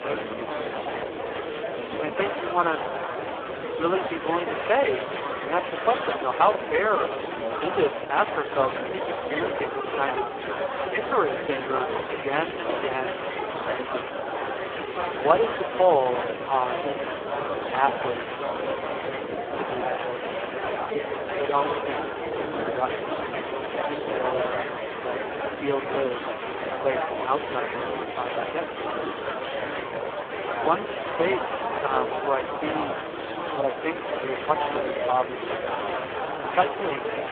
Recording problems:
phone-call audio; poor line
murmuring crowd; loud; throughout; 2 dB below the speech
traffic noise; noticeable; throughout; 20 dB below the speech
hiss; very faint; throughout; 25 dB below the speech

